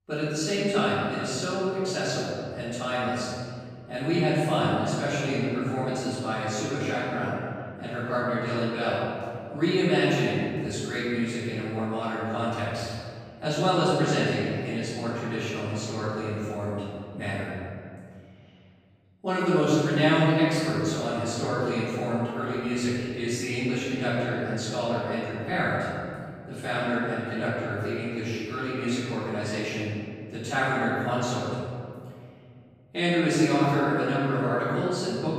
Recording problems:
room echo; strong; dies away in 2.1 s
off-mic speech; far

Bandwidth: 15.5 kHz